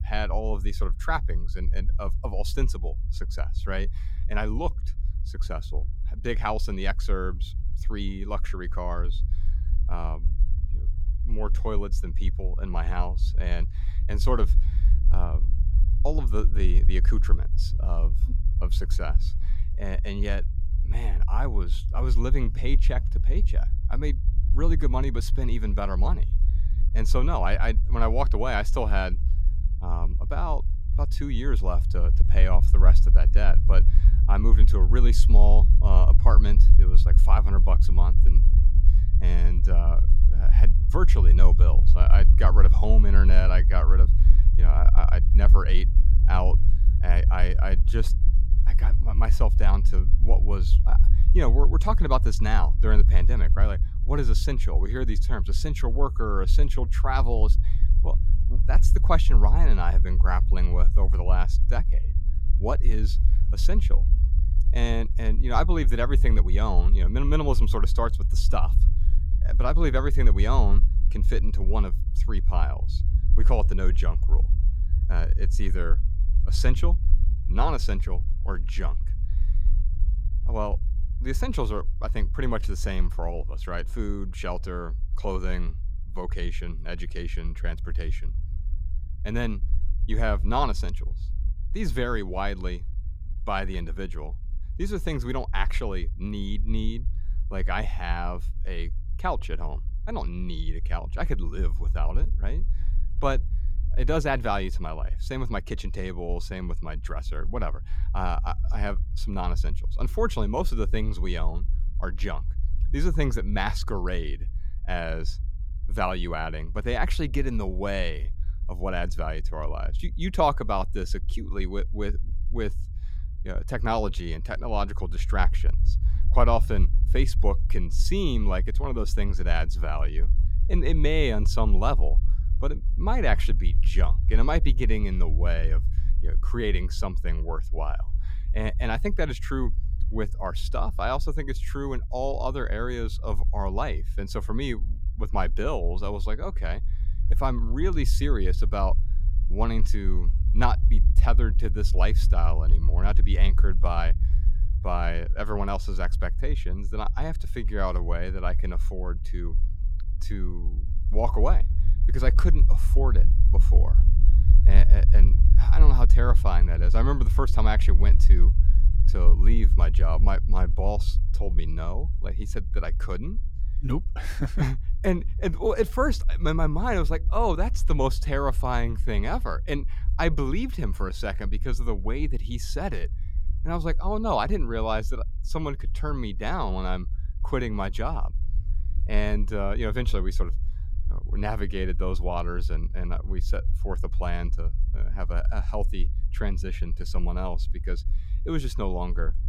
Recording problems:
low rumble; noticeable; throughout; 15 dB below the speech

